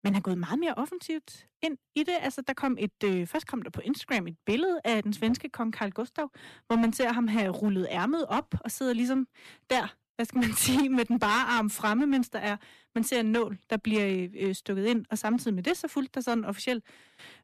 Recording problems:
distortion; slight; 6% of the sound clipped

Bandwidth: 14 kHz